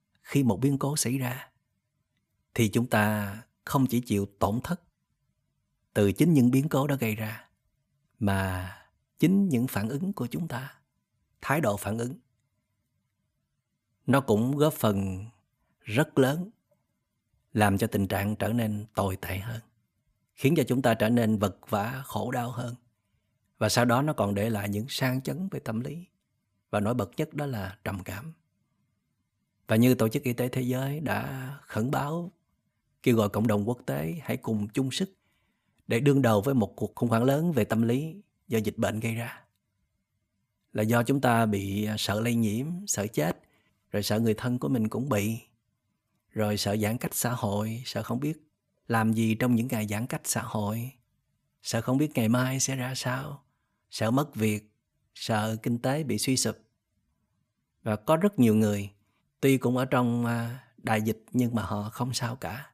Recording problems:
none

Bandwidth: 14.5 kHz